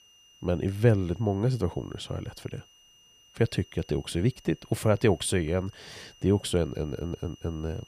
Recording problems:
high-pitched whine; faint; throughout; 3 kHz, 25 dB below the speech

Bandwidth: 15 kHz